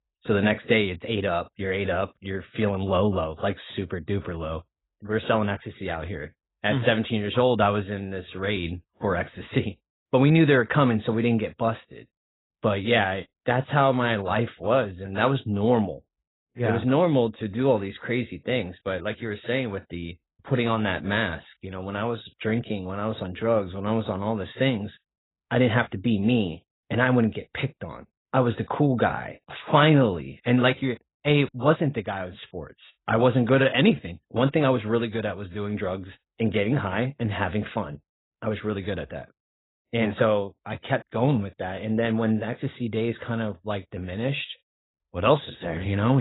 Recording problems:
garbled, watery; badly; nothing above 4 kHz
abrupt cut into speech; at the end

